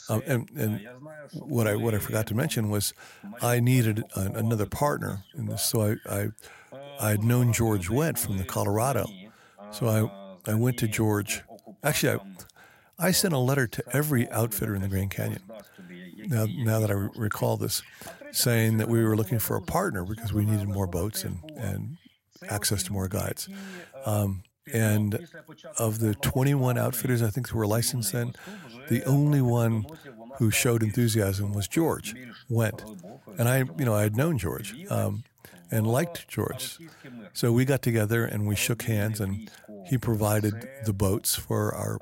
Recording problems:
voice in the background; noticeable; throughout; 20 dB below the speech

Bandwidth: 16 kHz